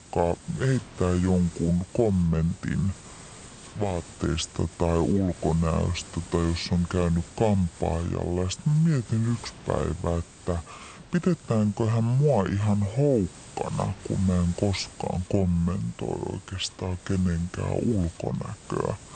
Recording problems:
wrong speed and pitch; too slow and too low; 0.6 times normal speed
hiss; noticeable; throughout; 20 dB below the speech

